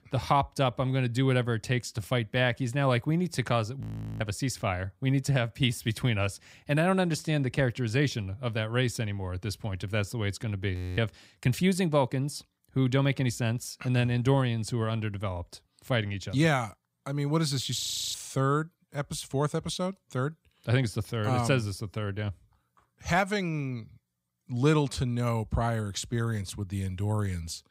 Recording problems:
audio freezing; at 4 s, at 11 s and at 18 s

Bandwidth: 15.5 kHz